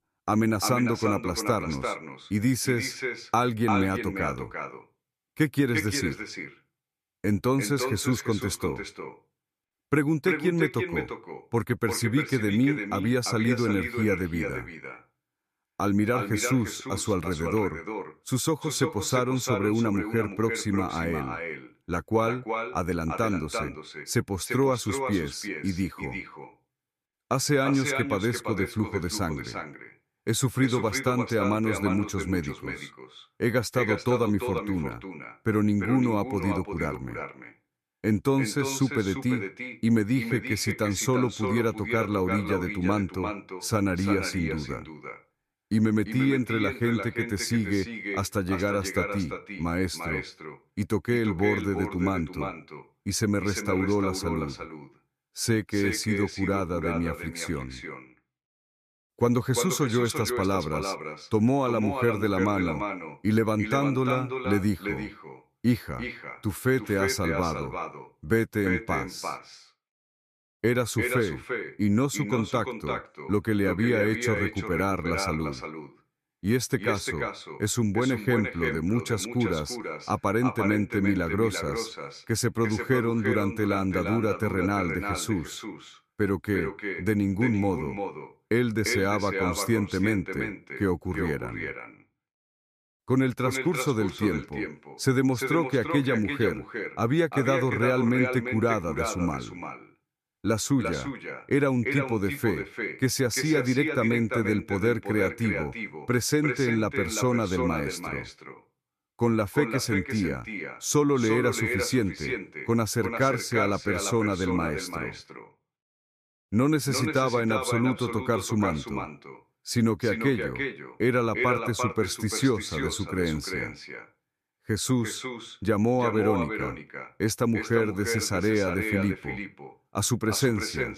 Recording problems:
echo of what is said; strong; throughout; 340 ms later, 6 dB below the speech

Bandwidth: 14.5 kHz